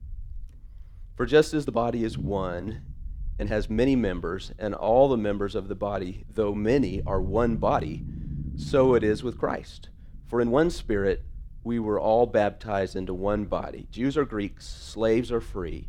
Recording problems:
low rumble; faint; throughout; 25 dB below the speech
uneven, jittery; strongly; from 1.5 to 15 s

